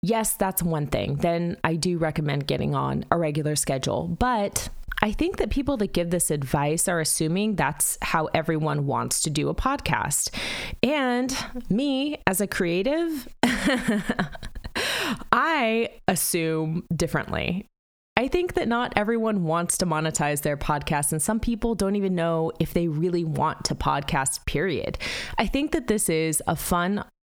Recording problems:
squashed, flat; heavily

